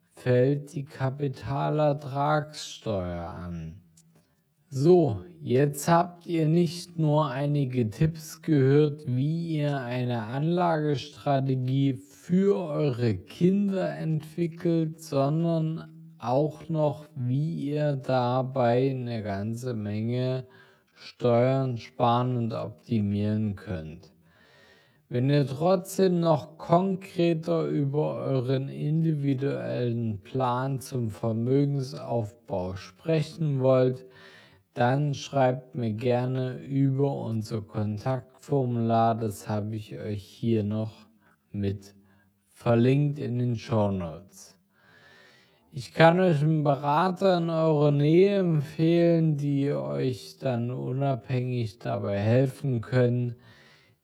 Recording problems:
wrong speed, natural pitch; too slow; 0.5 times normal speed

